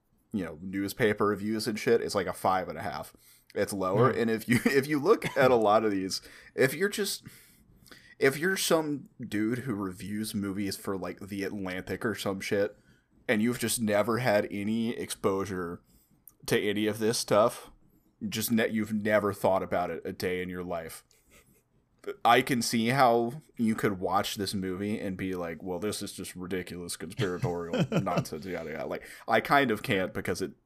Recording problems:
none

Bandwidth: 14.5 kHz